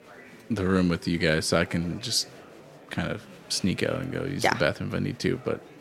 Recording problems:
murmuring crowd; faint; throughout; 20 dB below the speech

